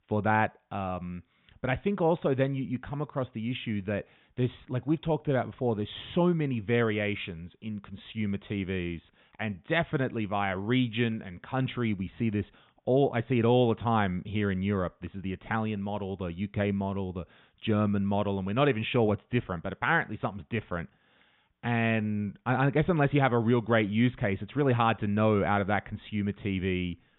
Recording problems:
high frequencies cut off; severe; nothing above 3.5 kHz

